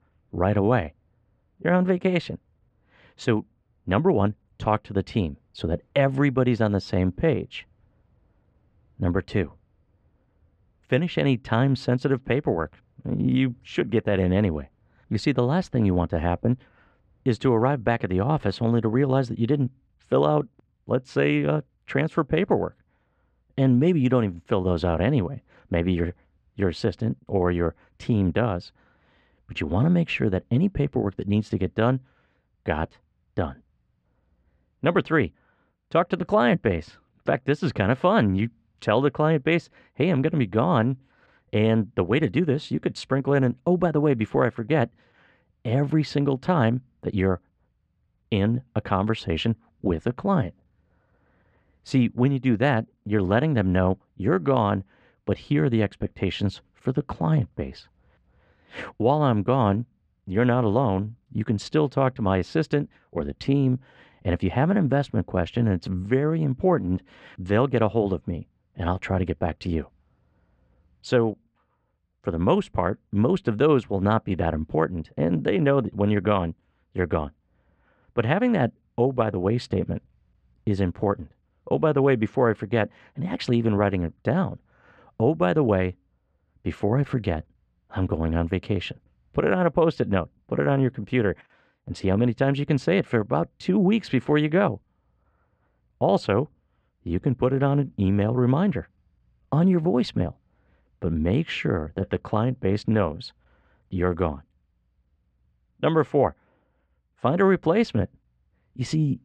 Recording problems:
muffled; very; fading above 2 kHz

